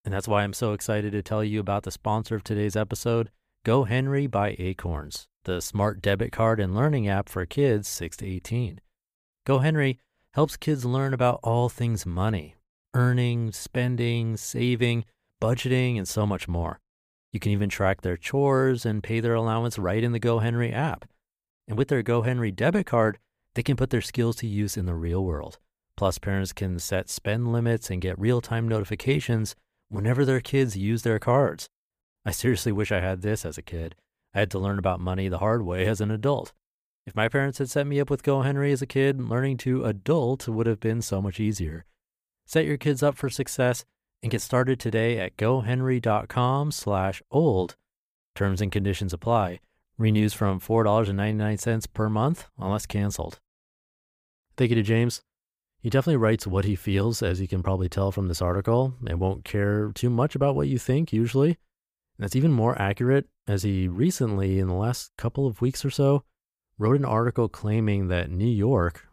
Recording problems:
none

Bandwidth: 15 kHz